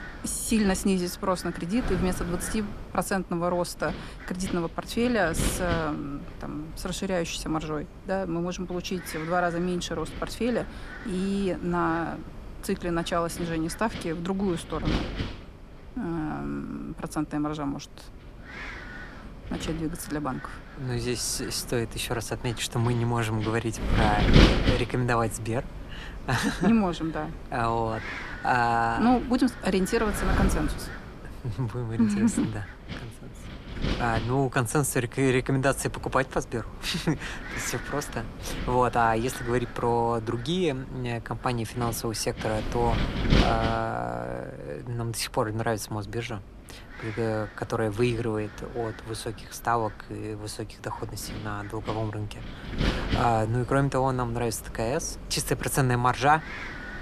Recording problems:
wind noise on the microphone; heavy; 8 dB below the speech

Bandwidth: 14 kHz